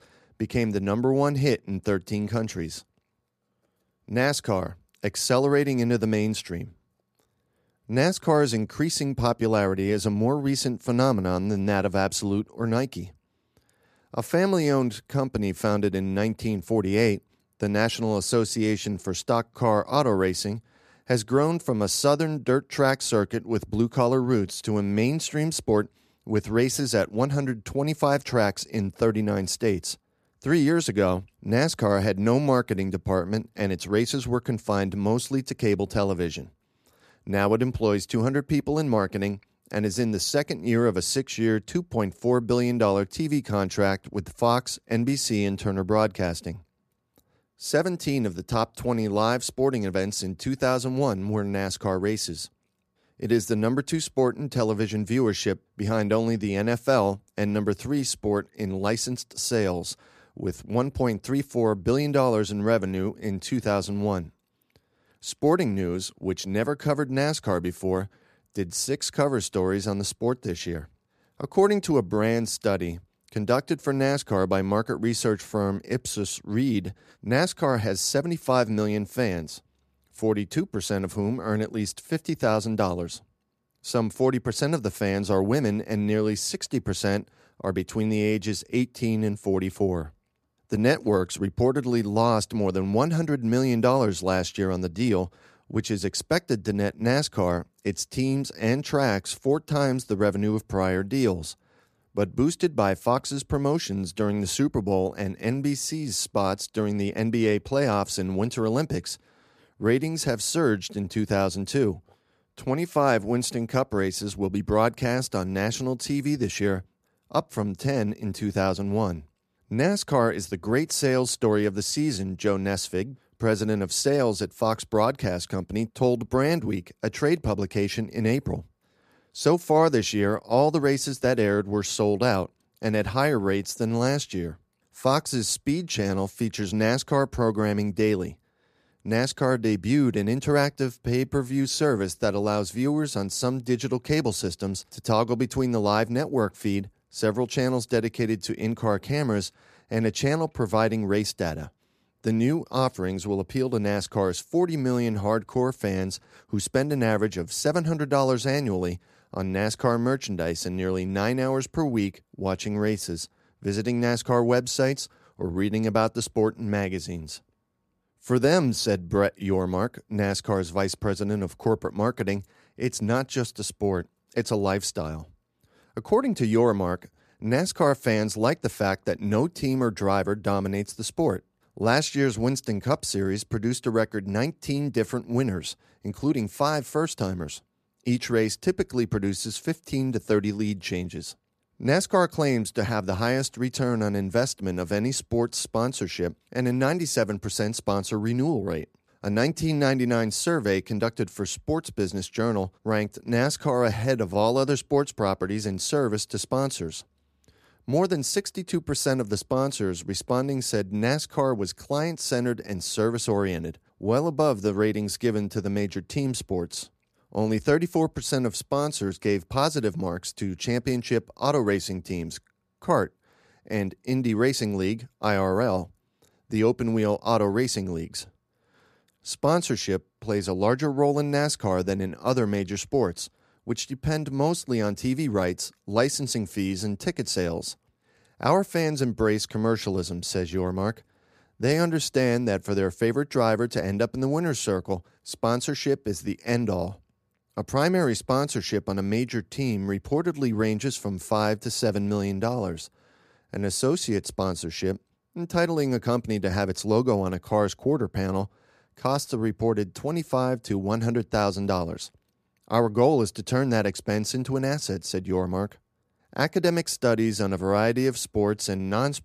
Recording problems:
none

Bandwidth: 14.5 kHz